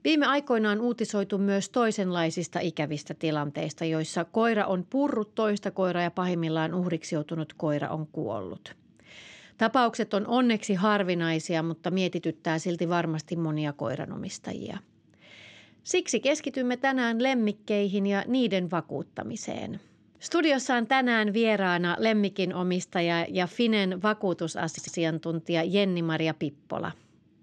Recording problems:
audio stuttering; at 25 s

